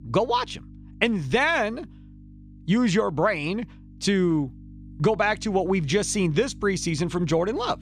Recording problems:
electrical hum; faint; throughout; 50 Hz, 30 dB below the speech

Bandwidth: 15 kHz